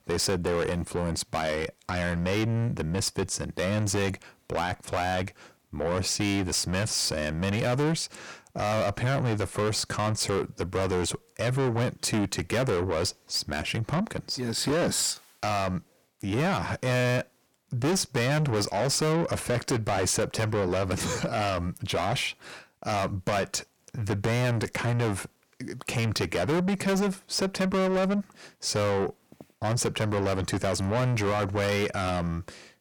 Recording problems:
distortion; heavy; 6 dB below the speech

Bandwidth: 18 kHz